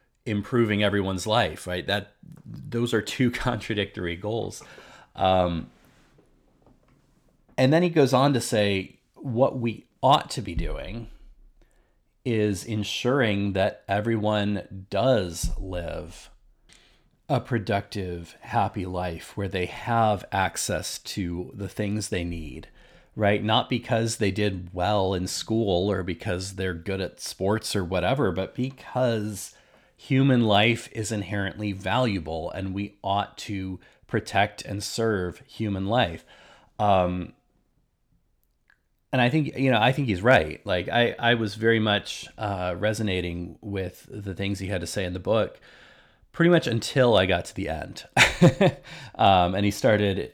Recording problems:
none

